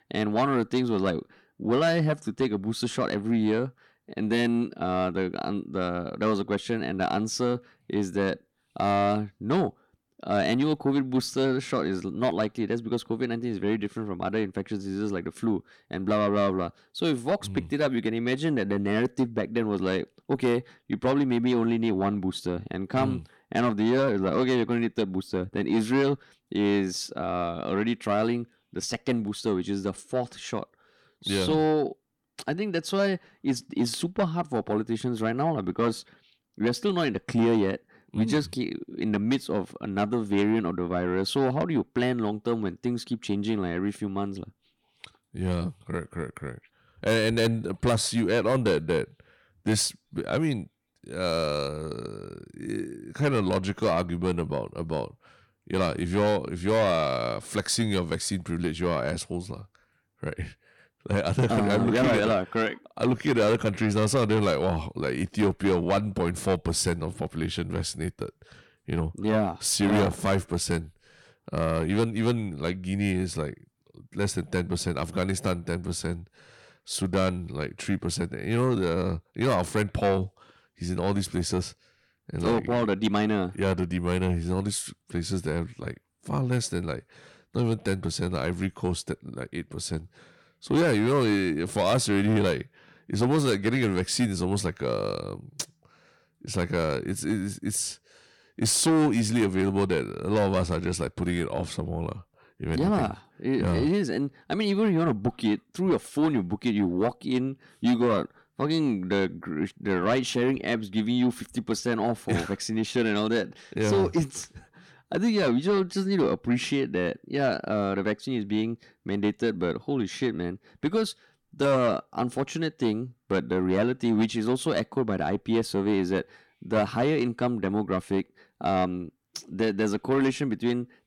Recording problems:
distortion; slight; 10 dB below the speech

